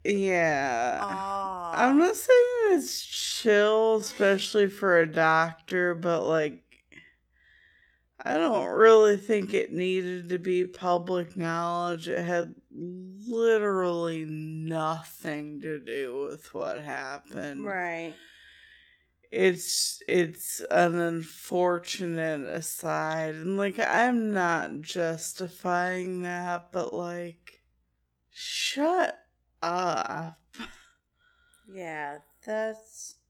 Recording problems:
wrong speed, natural pitch; too slow; 0.5 times normal speed

